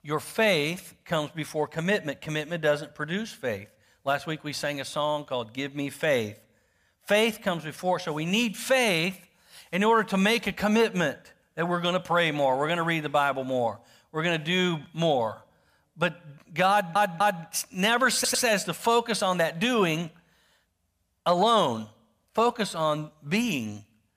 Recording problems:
audio stuttering; at 17 s and at 18 s

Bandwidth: 15 kHz